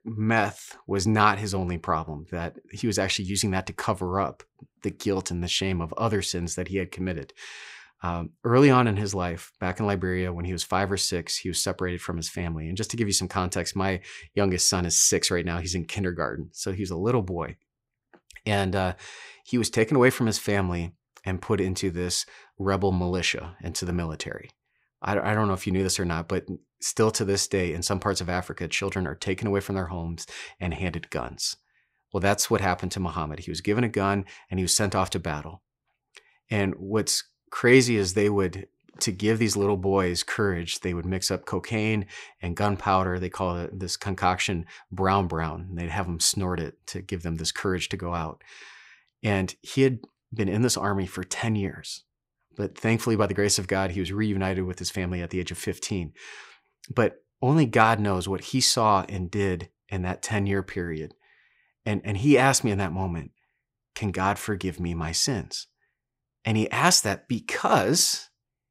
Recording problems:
none

